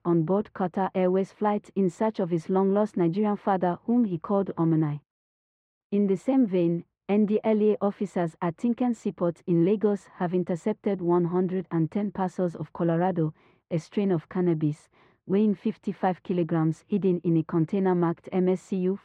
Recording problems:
muffled; very; fading above 1.5 kHz

